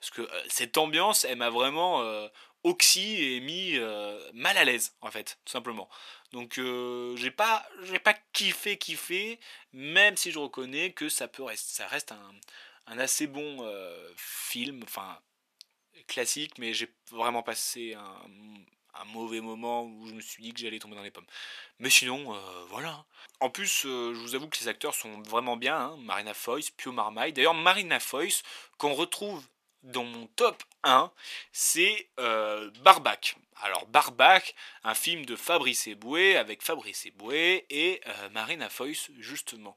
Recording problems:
thin; very; fading below 550 Hz

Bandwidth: 14.5 kHz